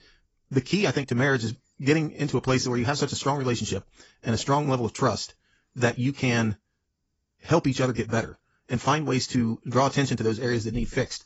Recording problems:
garbled, watery; badly; nothing above 7.5 kHz
wrong speed, natural pitch; too fast; 1.5 times normal speed

